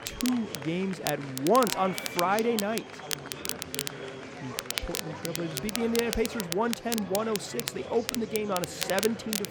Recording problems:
crackle, like an old record; loud; 5 dB below the speech
murmuring crowd; noticeable; throughout; 10 dB below the speech

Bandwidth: 18 kHz